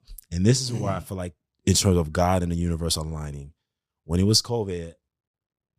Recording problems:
none

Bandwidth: 15 kHz